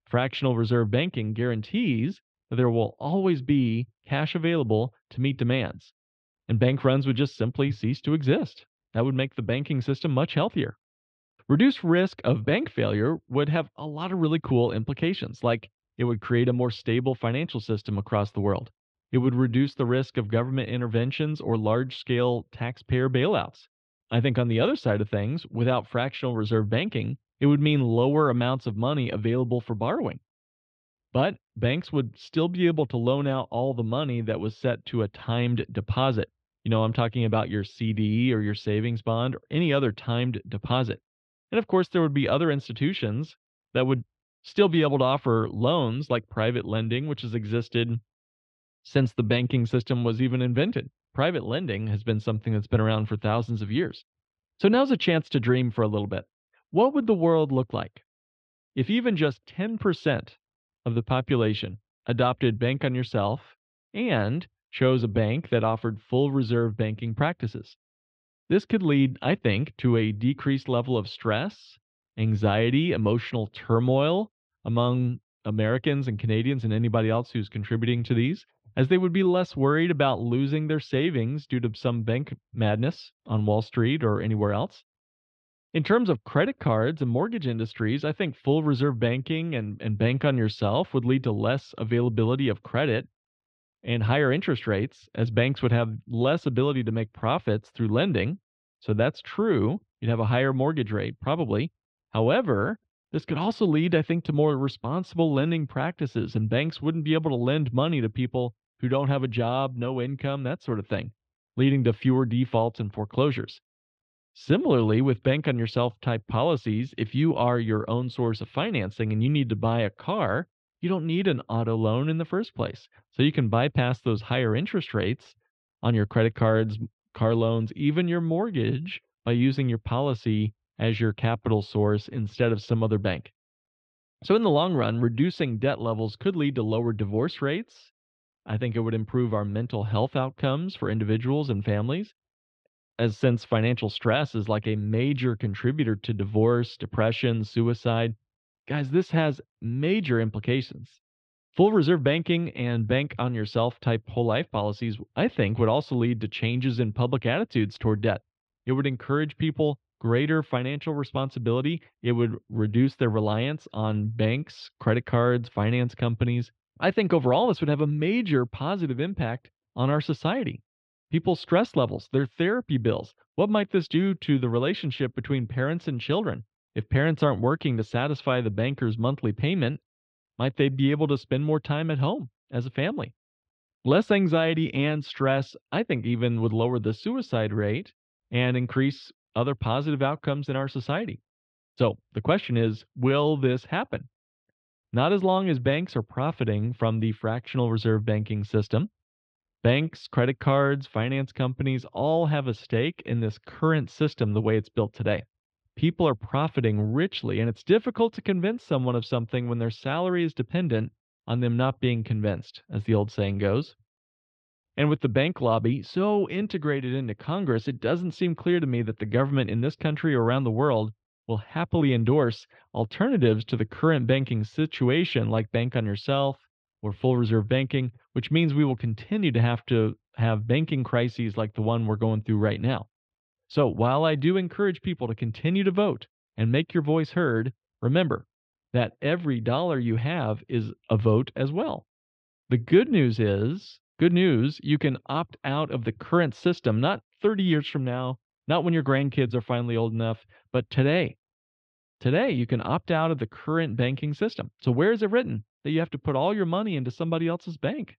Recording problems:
muffled; slightly; fading above 3.5 kHz

